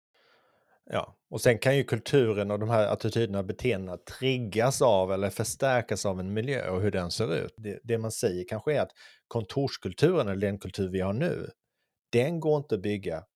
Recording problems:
none

